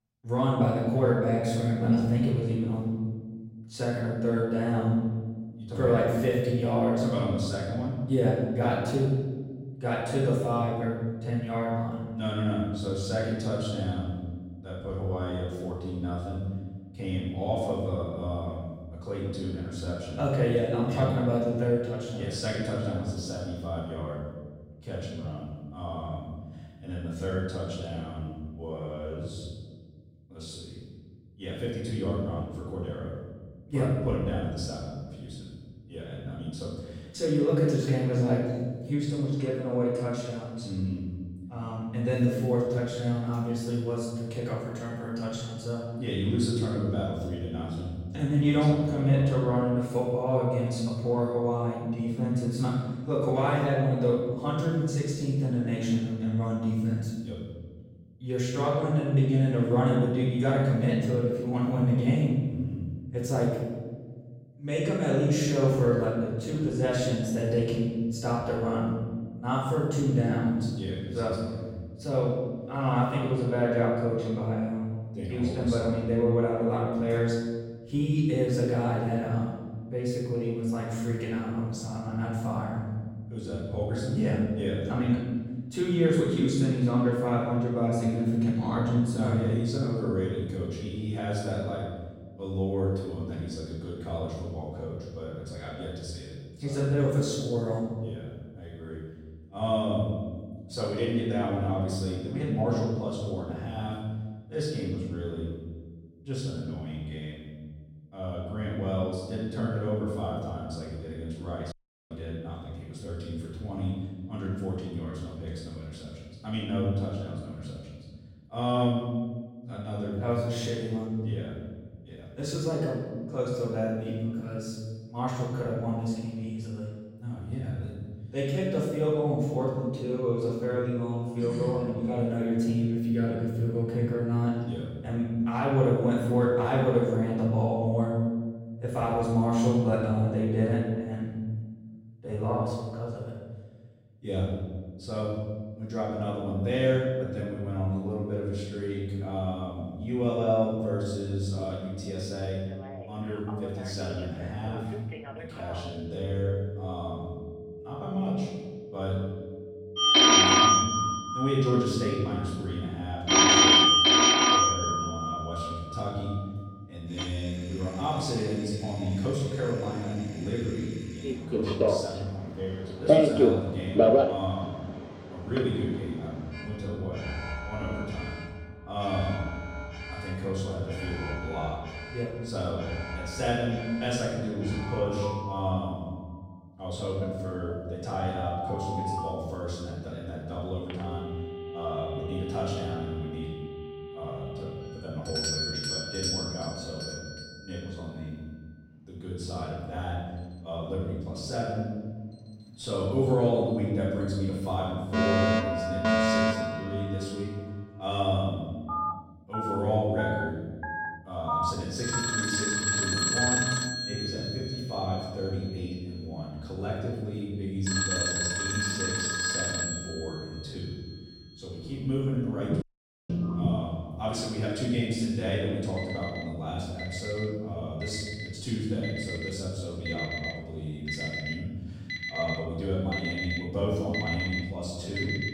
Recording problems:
room echo; strong; dies away in 1.5 s
off-mic speech; far
alarms or sirens; very loud; from 2:33 on; 4 dB above the speech
audio cutting out; at 1:52 and at 3:43

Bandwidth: 16 kHz